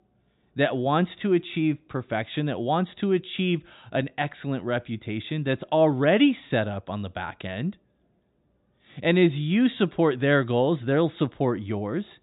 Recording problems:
high frequencies cut off; severe; nothing above 4 kHz

